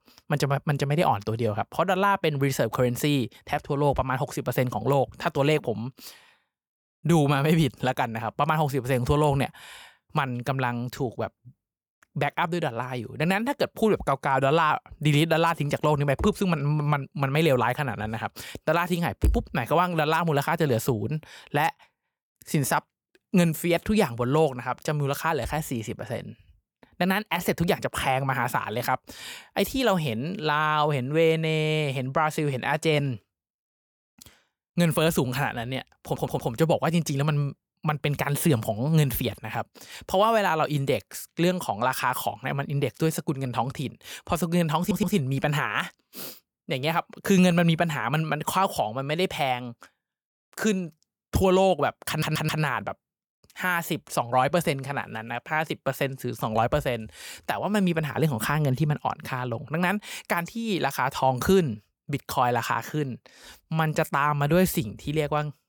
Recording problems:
audio stuttering; at 36 s, at 45 s and at 52 s

